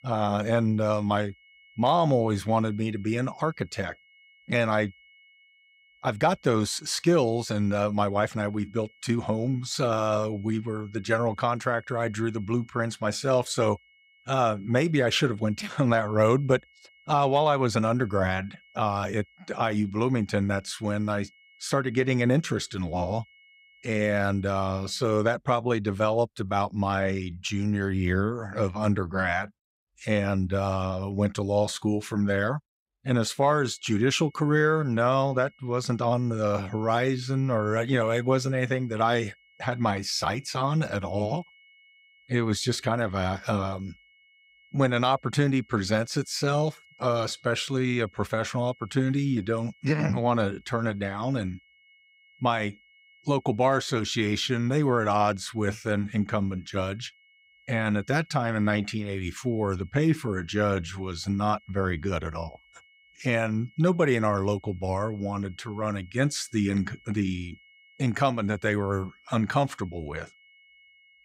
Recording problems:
high-pitched whine; faint; until 25 s and from 33 s on; 2 kHz, 30 dB below the speech

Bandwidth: 15.5 kHz